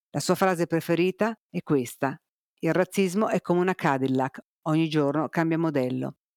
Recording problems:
none

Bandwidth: 18.5 kHz